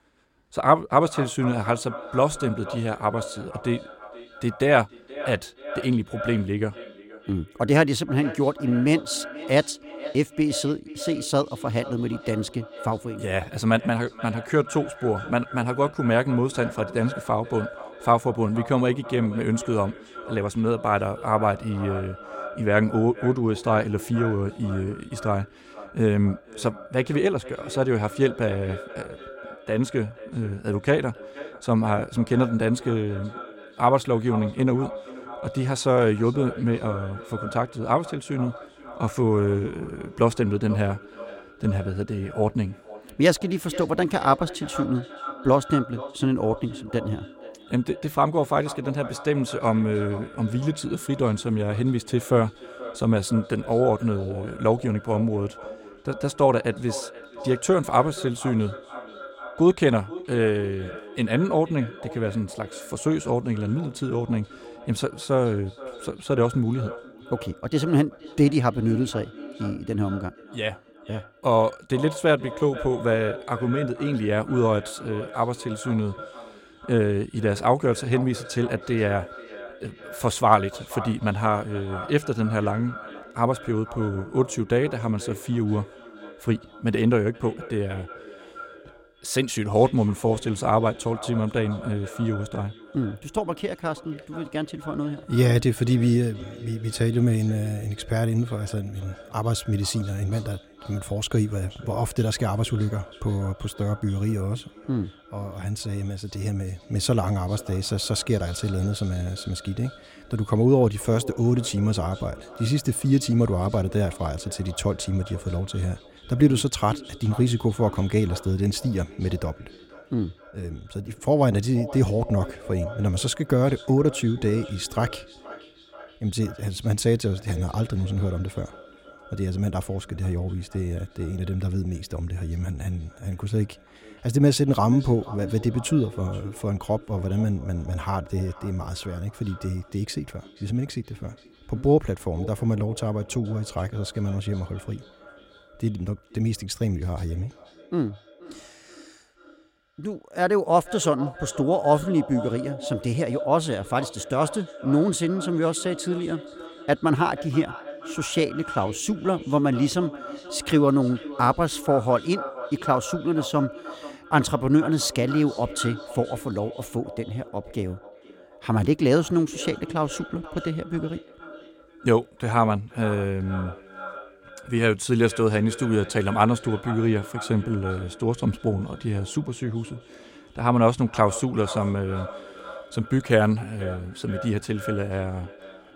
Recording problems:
echo of what is said; noticeable; throughout; 480 ms later, 15 dB below the speech

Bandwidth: 16.5 kHz